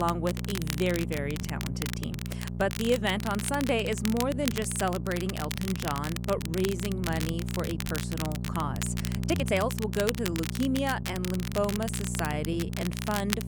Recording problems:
crackle, like an old record; loud; 7 dB below the speech
electrical hum; noticeable; throughout; 60 Hz, 15 dB below the speech
abrupt cut into speech; at the start
uneven, jittery; strongly; from 1 to 13 s

